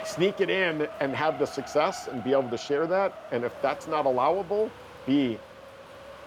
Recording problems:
wind noise on the microphone; occasional gusts; 15 dB below the speech

